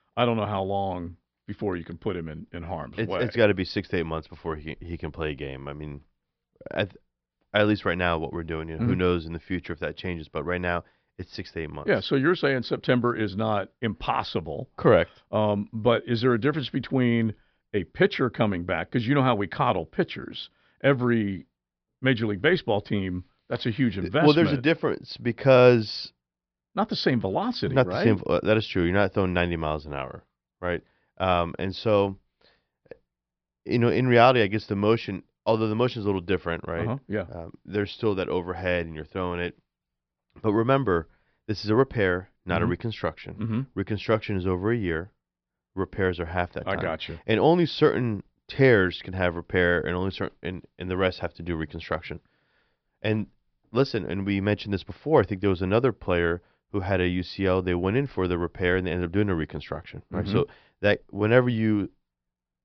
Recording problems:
high frequencies cut off; noticeable; nothing above 5.5 kHz

